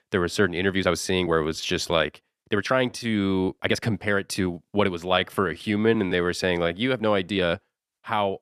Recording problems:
uneven, jittery; strongly; from 0.5 to 7.5 s

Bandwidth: 14.5 kHz